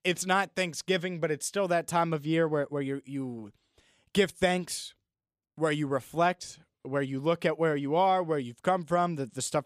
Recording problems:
none

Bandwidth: 14.5 kHz